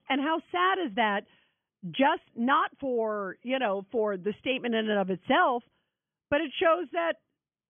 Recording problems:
high frequencies cut off; severe; nothing above 3.5 kHz

